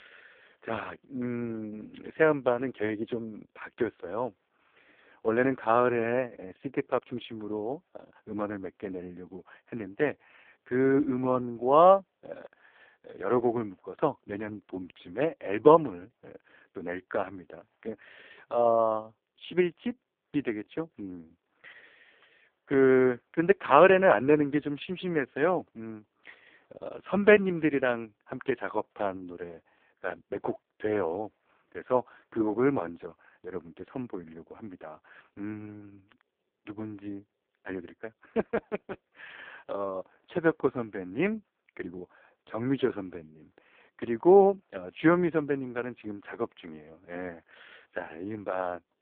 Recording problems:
phone-call audio; poor line

